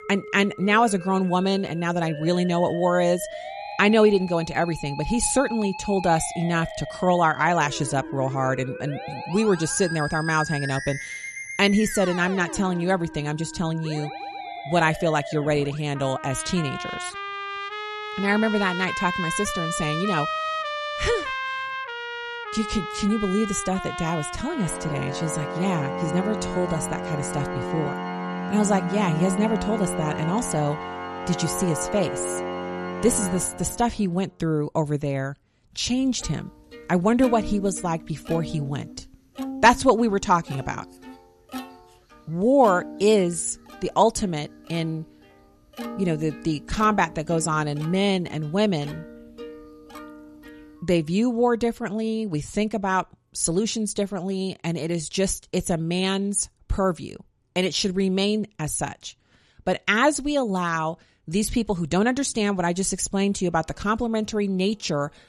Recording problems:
background music; loud; throughout; 8 dB below the speech

